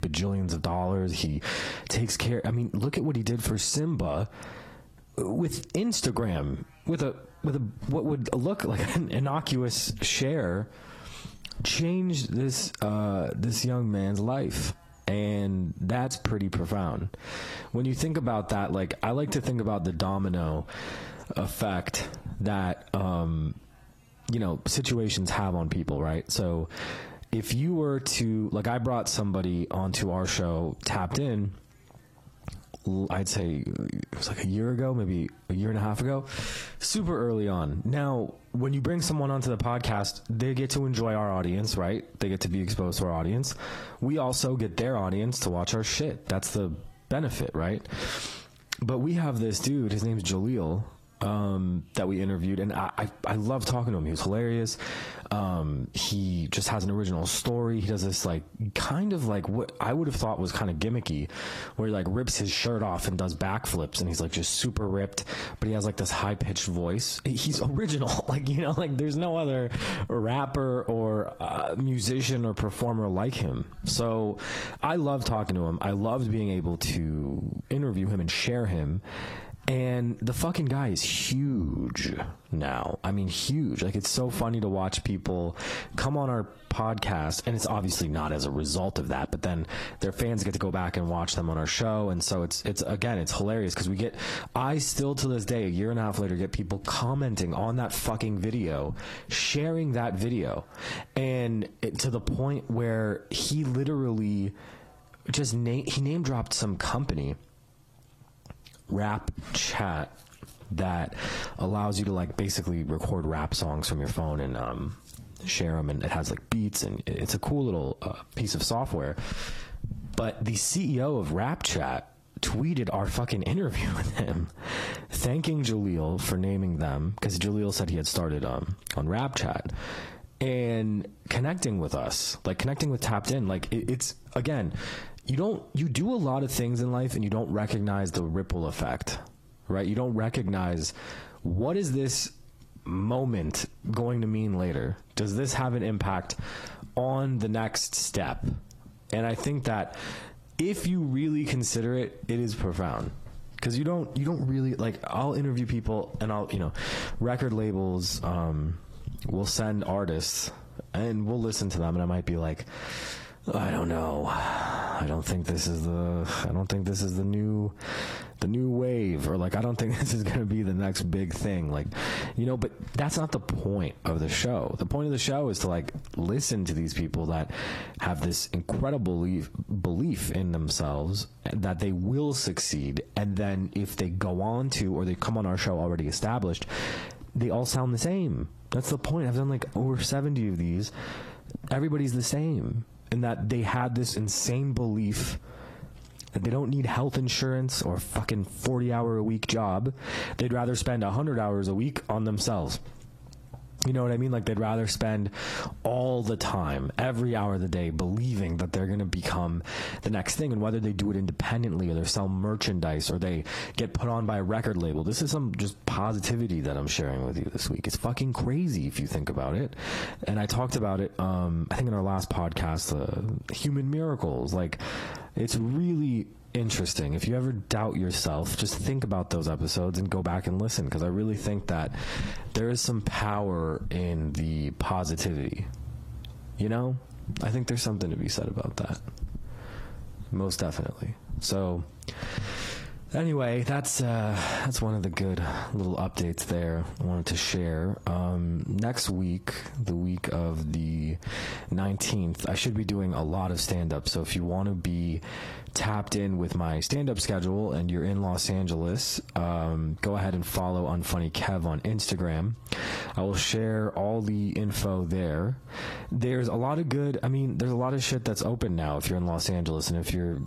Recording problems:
squashed, flat; heavily
garbled, watery; slightly; nothing above 13 kHz

